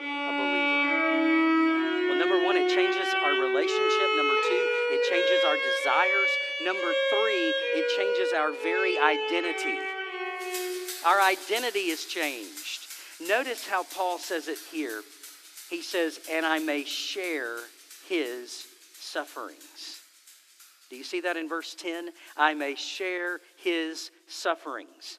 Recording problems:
thin; somewhat; fading below 300 Hz
background music; very loud; throughout; 4 dB above the speech

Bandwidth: 14.5 kHz